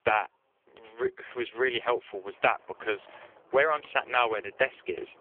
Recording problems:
phone-call audio; poor line; nothing above 3 kHz
traffic noise; faint; throughout; 25 dB below the speech

